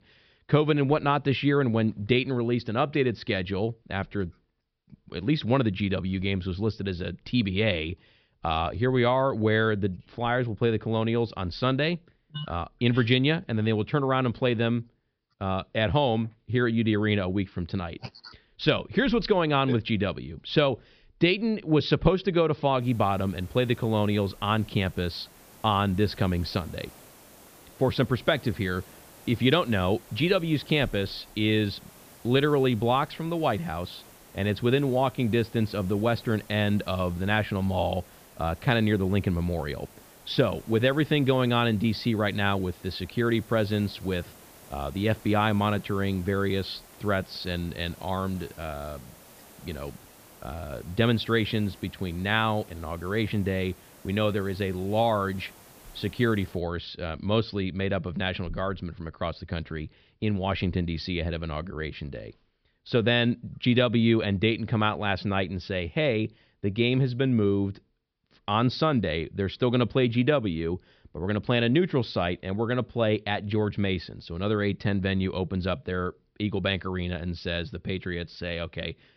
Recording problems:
high frequencies cut off; noticeable; nothing above 5.5 kHz
hiss; faint; from 23 to 57 s; 25 dB below the speech

